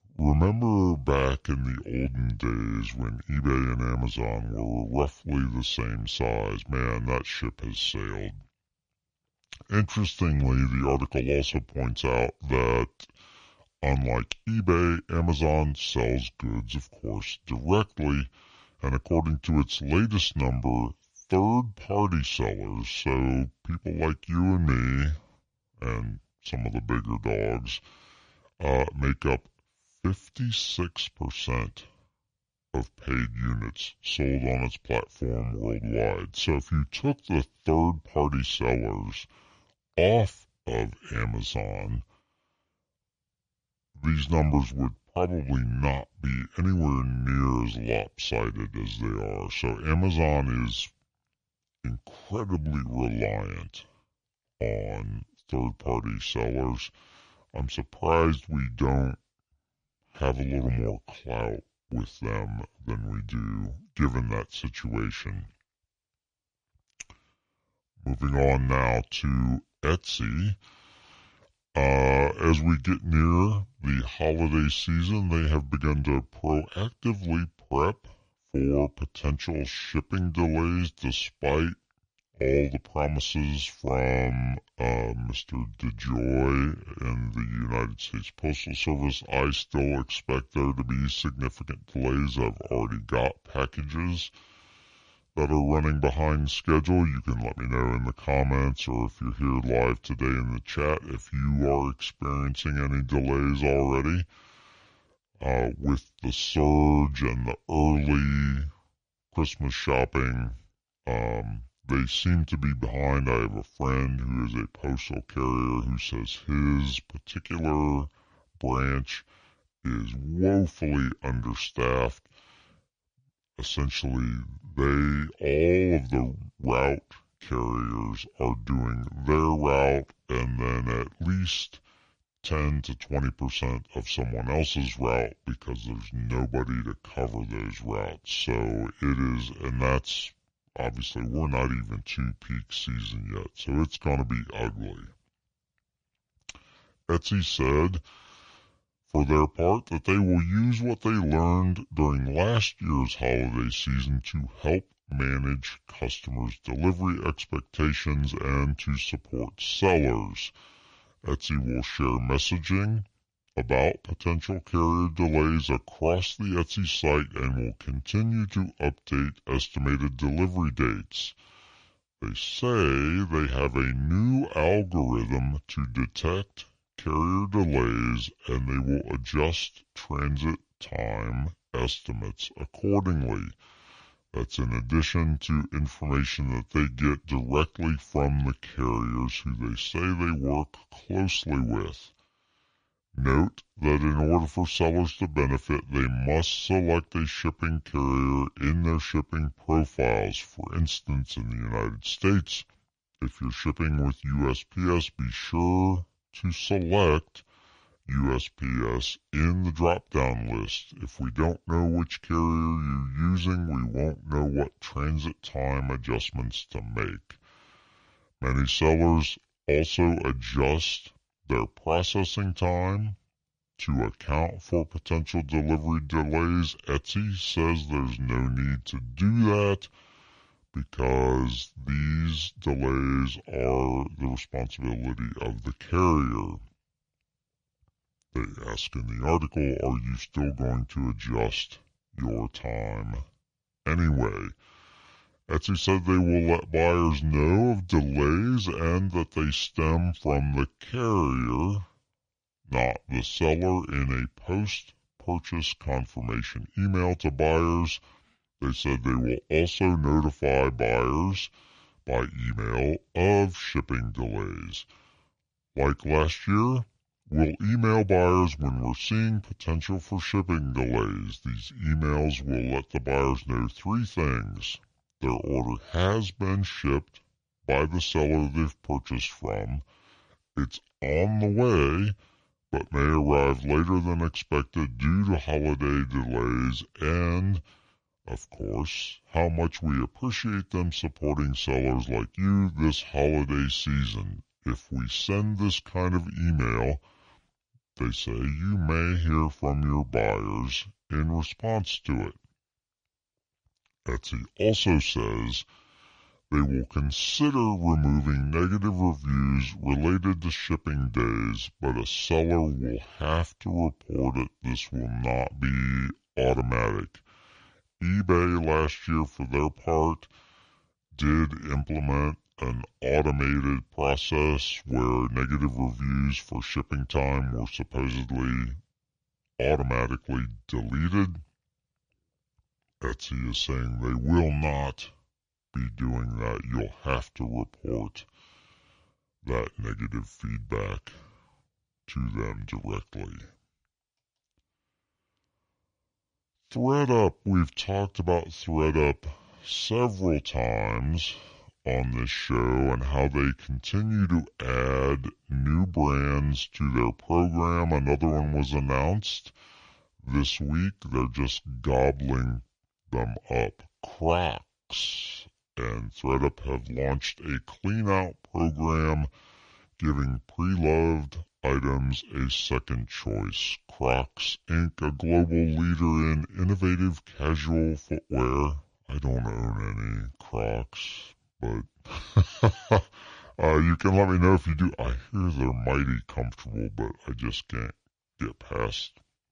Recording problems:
wrong speed and pitch; too slow and too low; 0.7 times normal speed

